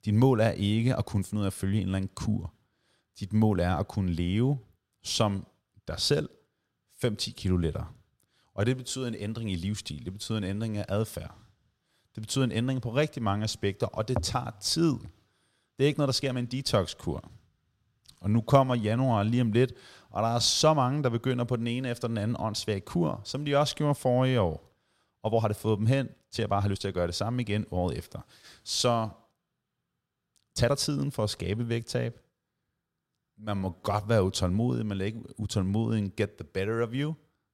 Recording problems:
uneven, jittery; strongly; from 1 to 34 s

